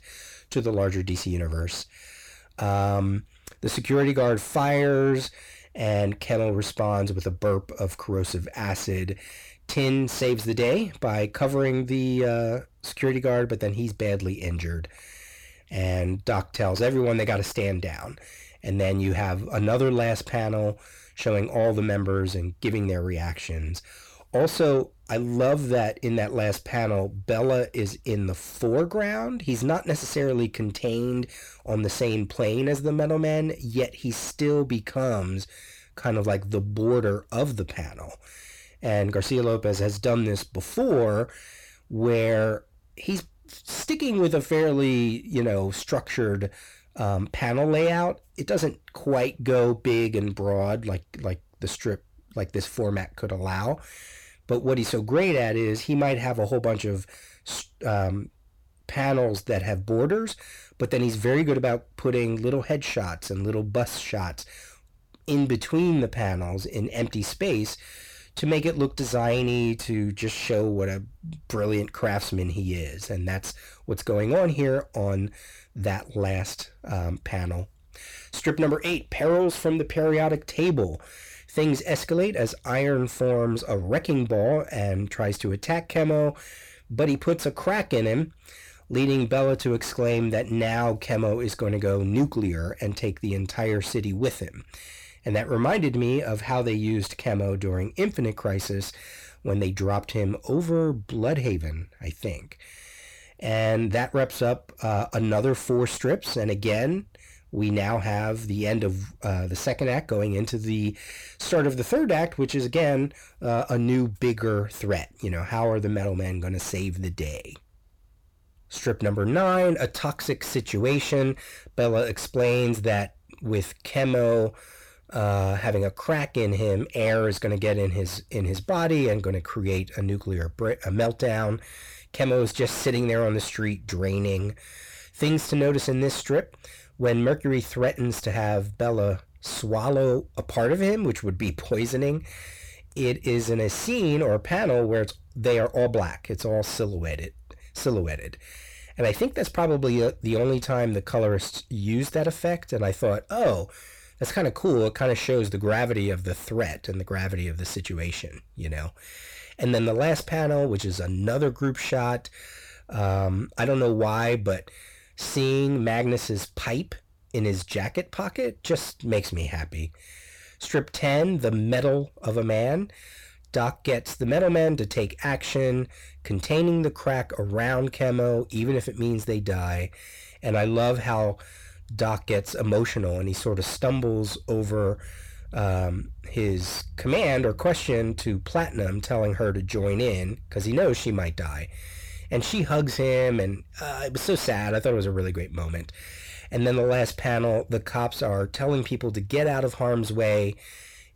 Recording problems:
distortion; slight; 10 dB below the speech

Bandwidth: 18.5 kHz